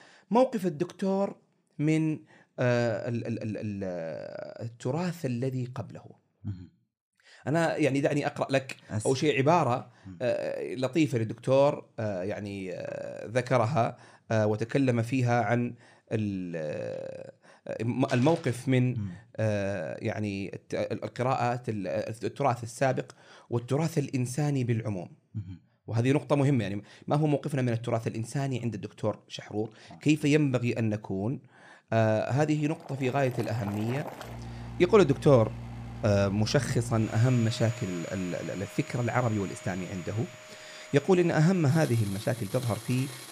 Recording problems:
household noises; noticeable; from 33 s on; 15 dB below the speech

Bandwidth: 14.5 kHz